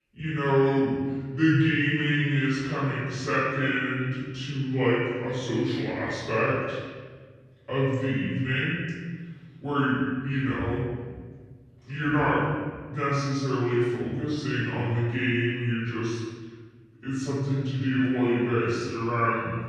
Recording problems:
room echo; strong; dies away in 1.6 s
off-mic speech; far
wrong speed and pitch; too slow and too low; 0.7 times normal speed

